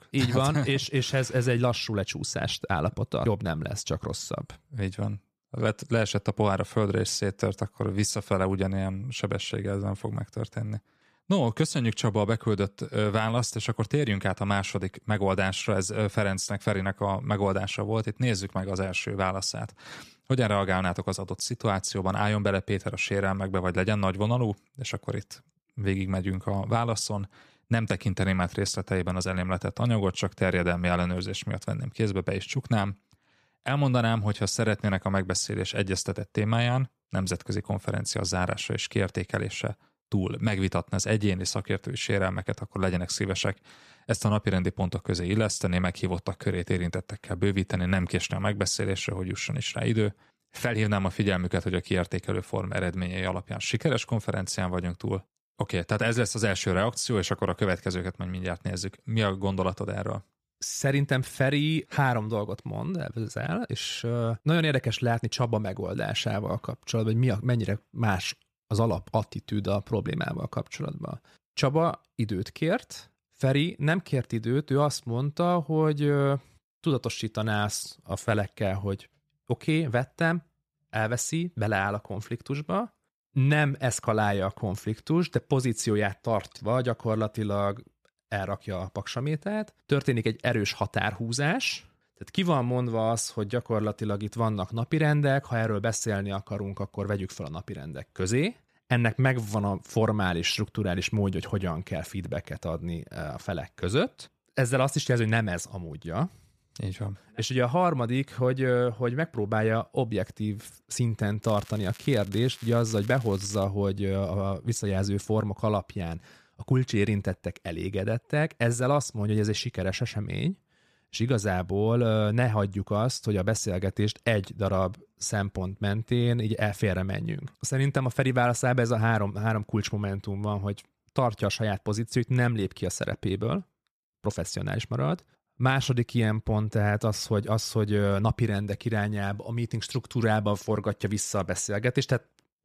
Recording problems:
crackling; faint; from 1:51 to 1:54; 20 dB below the speech

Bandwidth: 14.5 kHz